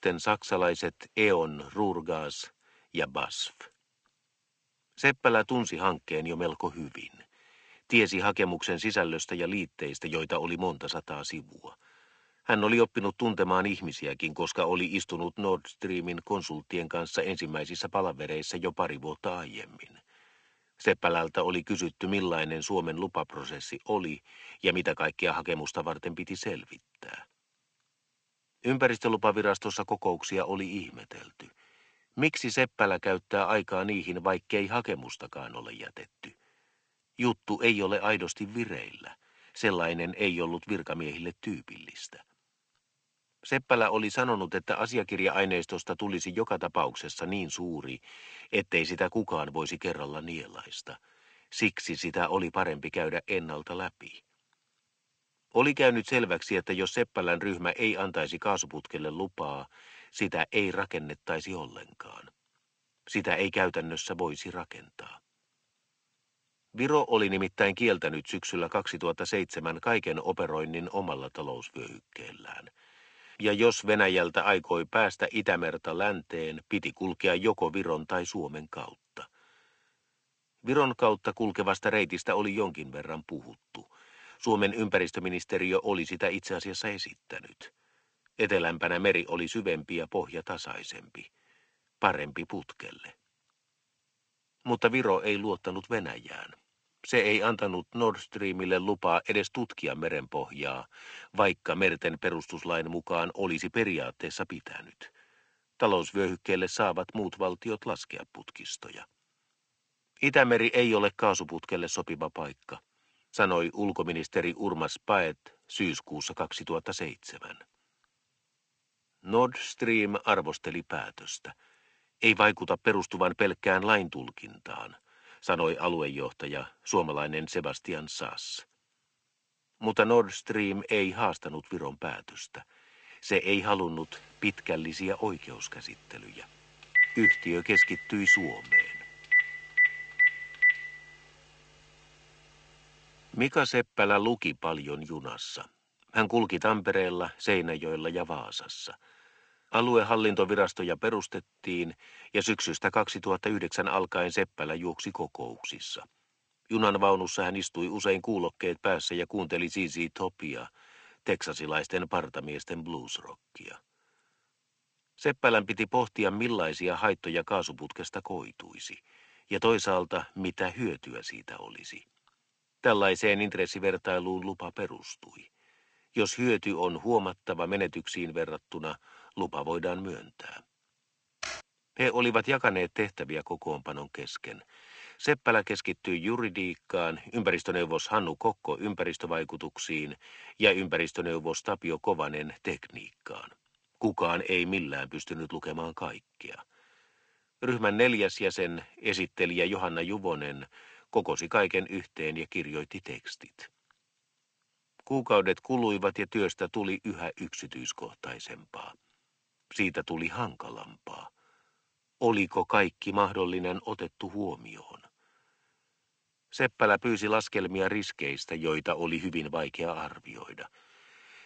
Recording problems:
garbled, watery; slightly; nothing above 7.5 kHz
thin; very slightly; fading below 400 Hz
phone ringing; loud; from 2:17 to 2:21; peak 9 dB above the speech
keyboard typing; noticeable; at 3:01; peak 9 dB below the speech

